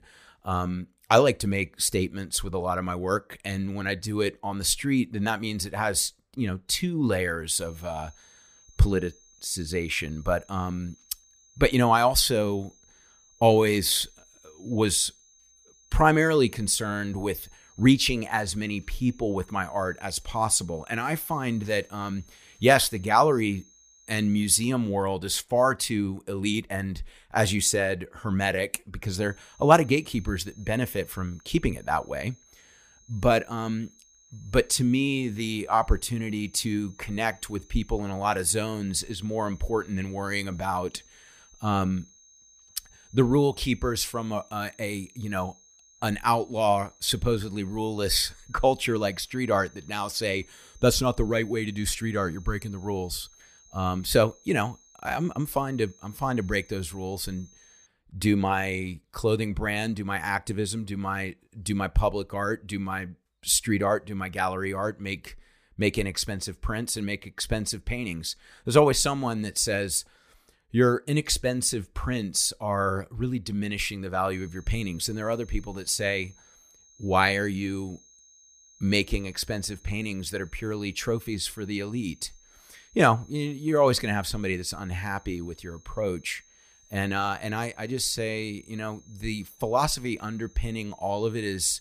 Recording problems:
high-pitched whine; faint; from 7.5 to 25 s, from 29 to 58 s and from 1:14 on; 6.5 kHz, 30 dB below the speech

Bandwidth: 15 kHz